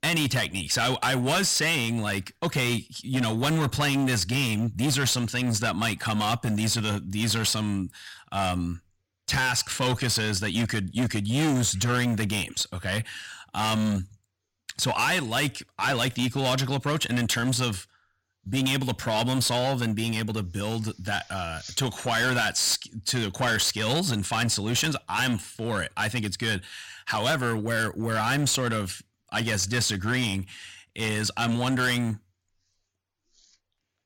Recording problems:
distortion; heavy; 13% of the sound clipped

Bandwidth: 16.5 kHz